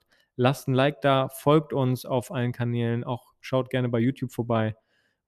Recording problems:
none

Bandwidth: 13.5 kHz